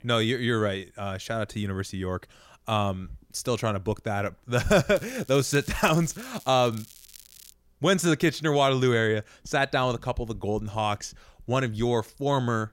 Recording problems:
crackling; faint; from 5 to 7.5 s; 20 dB below the speech

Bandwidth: 16 kHz